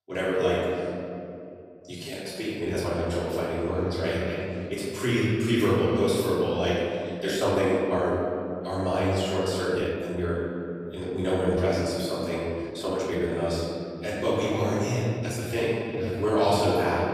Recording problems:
room echo; strong; dies away in 2.6 s
off-mic speech; far
uneven, jittery; strongly; from 1.5 to 16 s

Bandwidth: 14.5 kHz